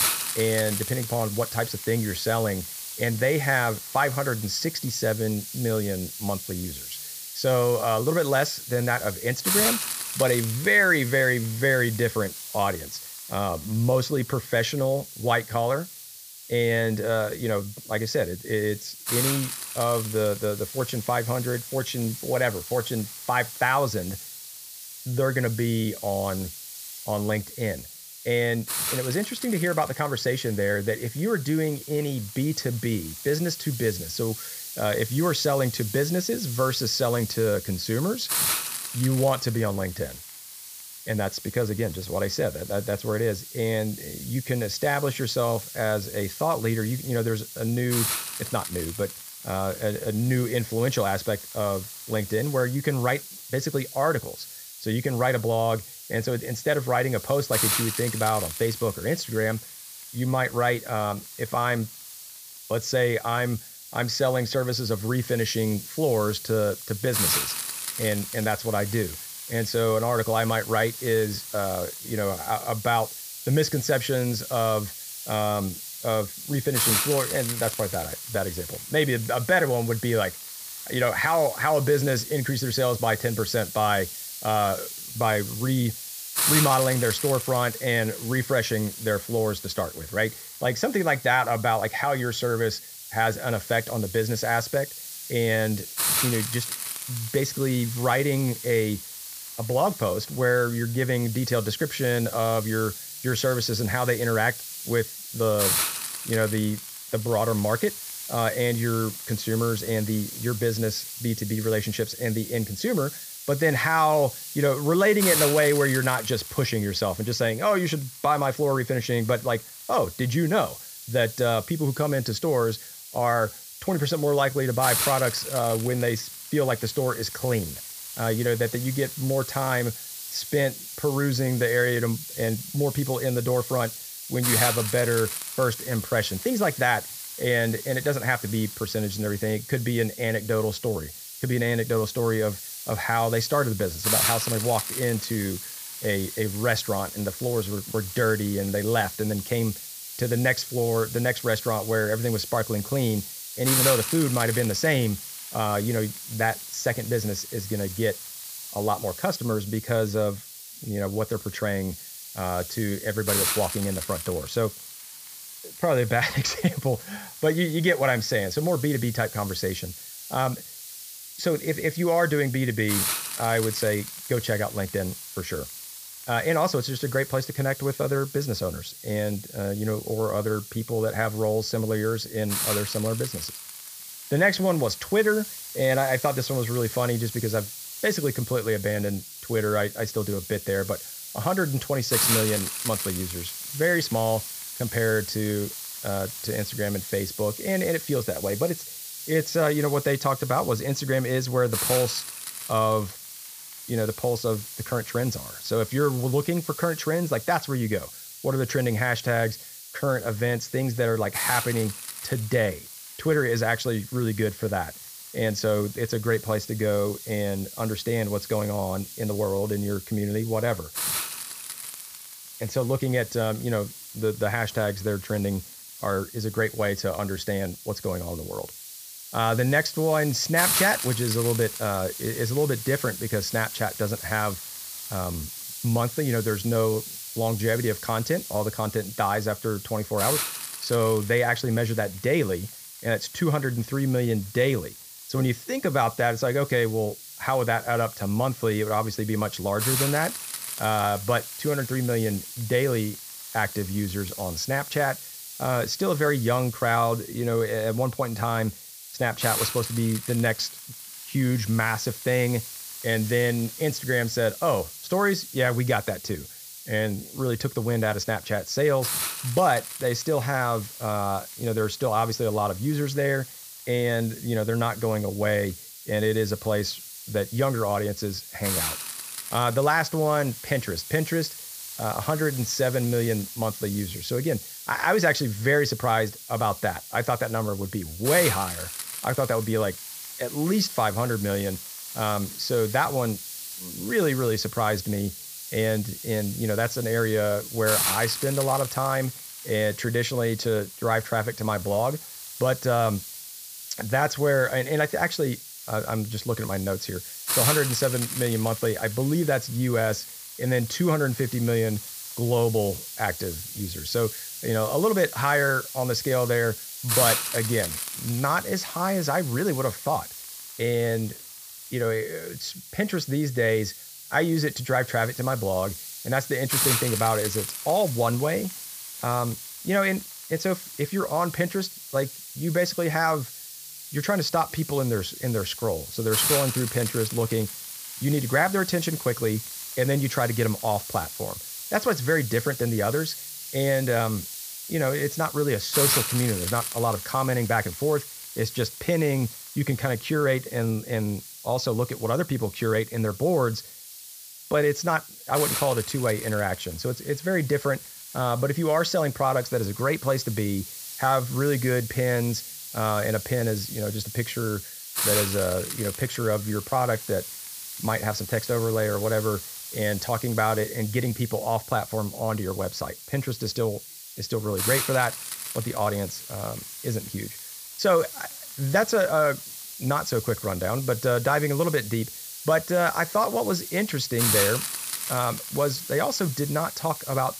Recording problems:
high frequencies cut off; noticeable; nothing above 8 kHz
hiss; loud; throughout; 7 dB below the speech

